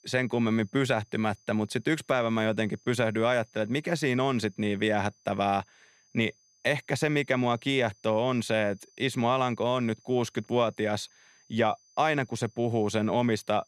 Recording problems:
high-pitched whine; faint; throughout; 6 kHz, 35 dB below the speech

